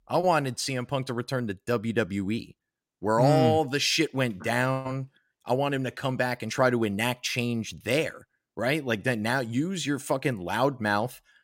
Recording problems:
none

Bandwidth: 16 kHz